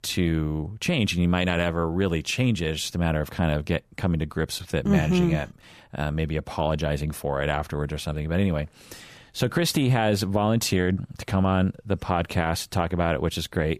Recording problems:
none

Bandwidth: 14.5 kHz